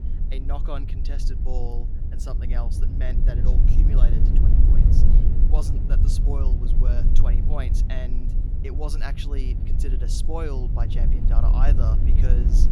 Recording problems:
low rumble; loud; throughout; 2 dB below the speech

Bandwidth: 17.5 kHz